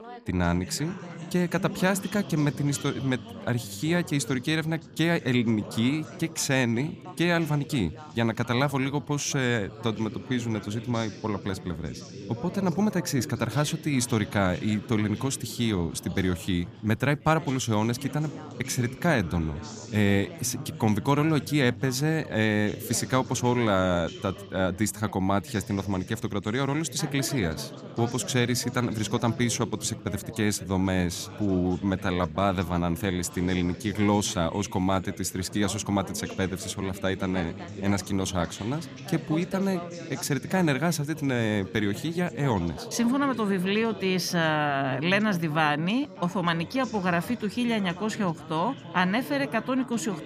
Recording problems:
background chatter; noticeable; throughout; 4 voices, 15 dB below the speech

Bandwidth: 15 kHz